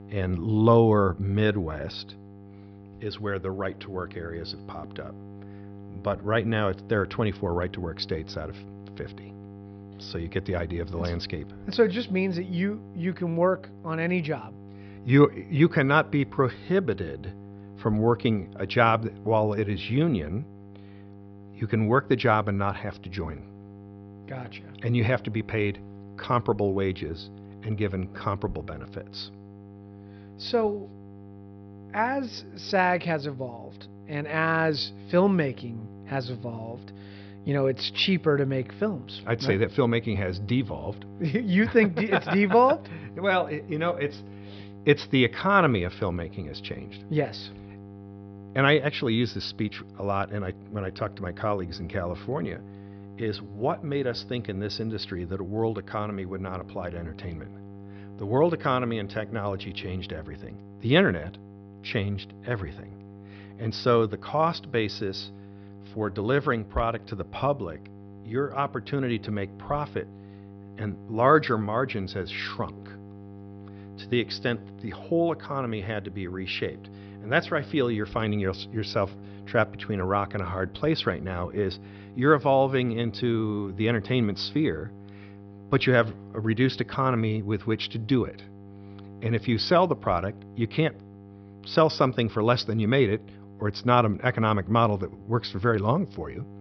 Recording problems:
high frequencies cut off; noticeable; nothing above 5.5 kHz
electrical hum; faint; throughout; 50 Hz, 25 dB below the speech

